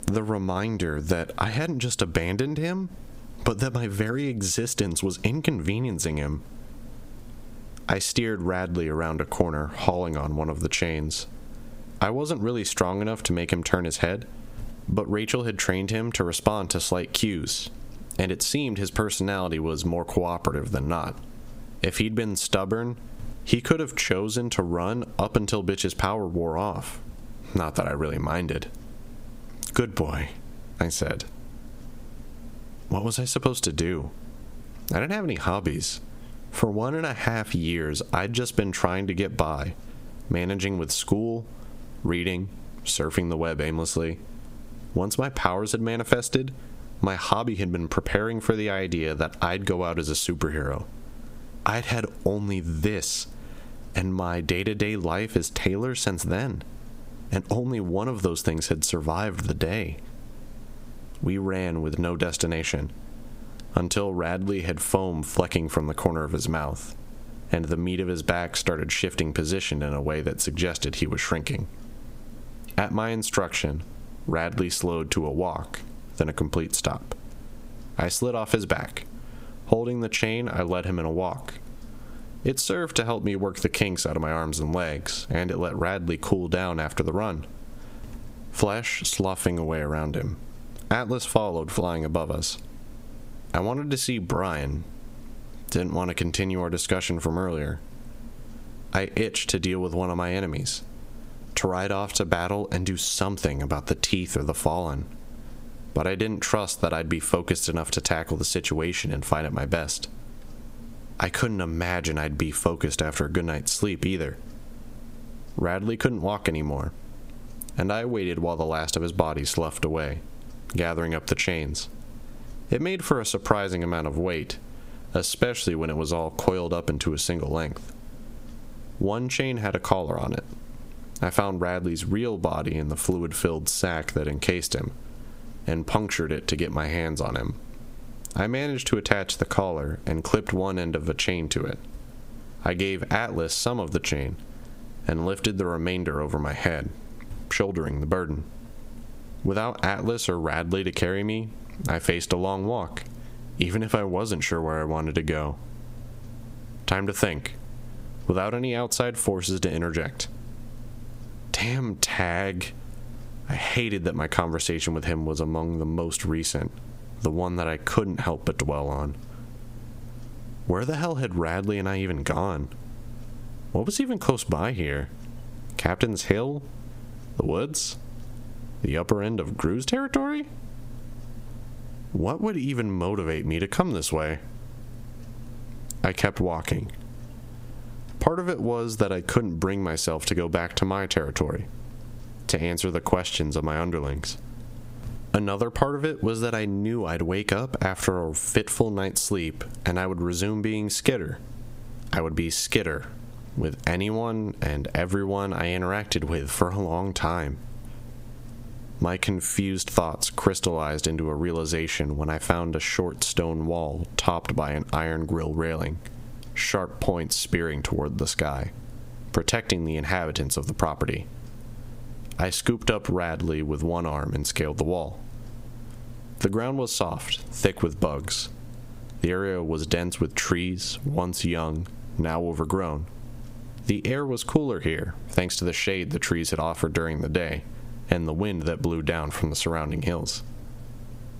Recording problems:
squashed, flat; heavily

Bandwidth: 15.5 kHz